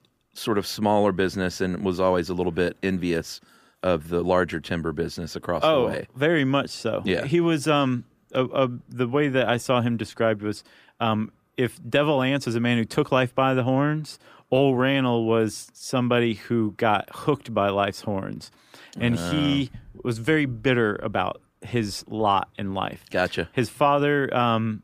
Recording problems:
none

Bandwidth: 15 kHz